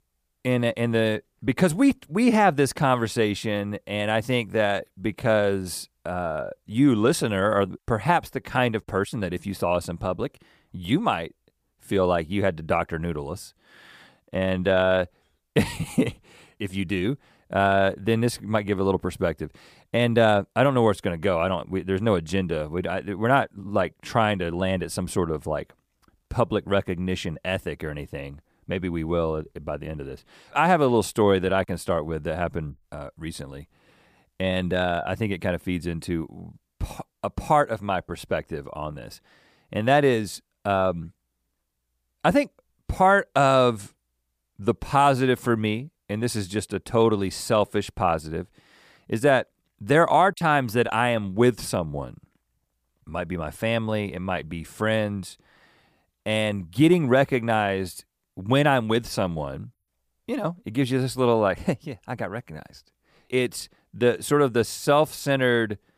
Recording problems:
none

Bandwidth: 15 kHz